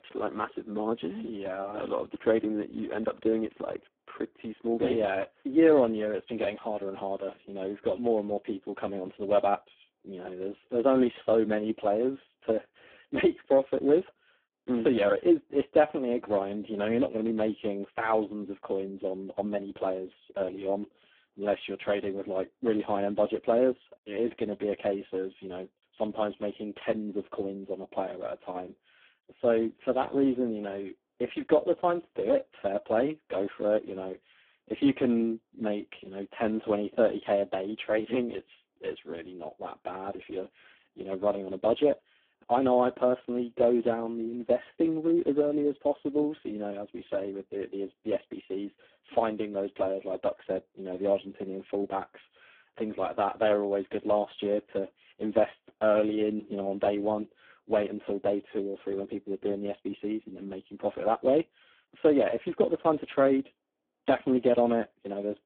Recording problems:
phone-call audio; poor line

